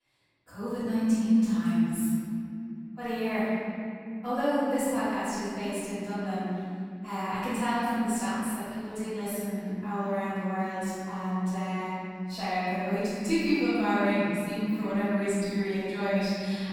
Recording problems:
room echo; strong; dies away in 2.9 s
off-mic speech; far

